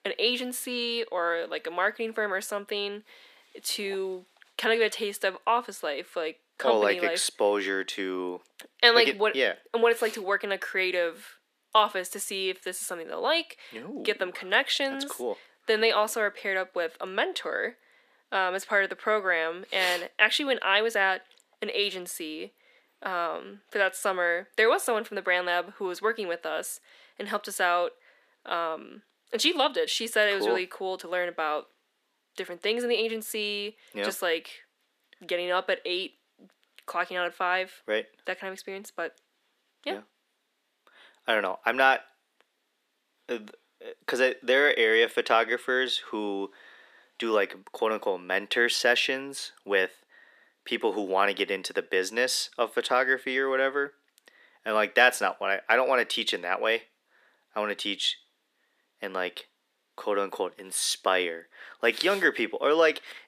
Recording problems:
thin; very; fading below 400 Hz

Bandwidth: 14.5 kHz